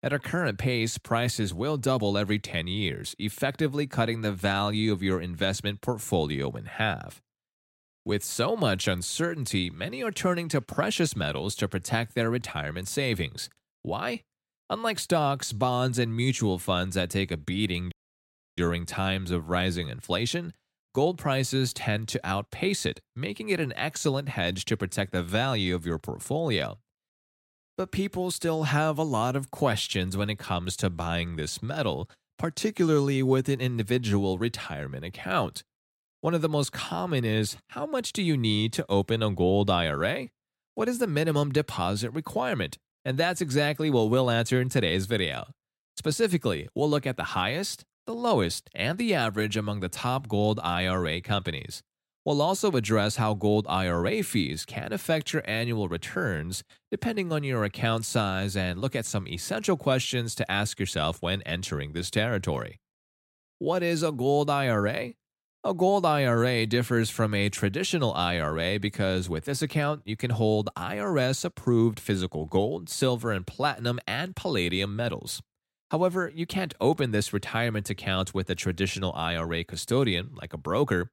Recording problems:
audio cutting out; at 18 s for 0.5 s

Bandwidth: 16 kHz